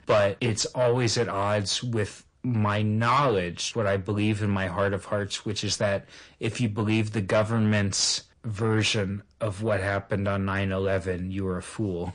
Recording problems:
distortion; slight; 10 dB below the speech
garbled, watery; slightly; nothing above 9.5 kHz

